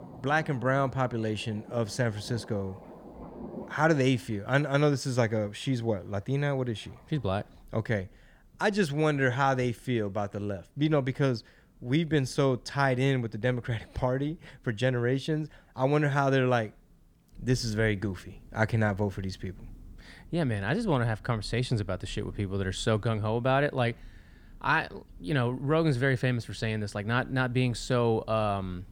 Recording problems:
rain or running water; faint; throughout; 25 dB below the speech

